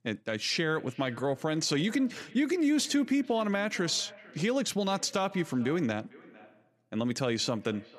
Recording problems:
echo of what is said; faint; throughout; 450 ms later, 20 dB below the speech

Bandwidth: 14.5 kHz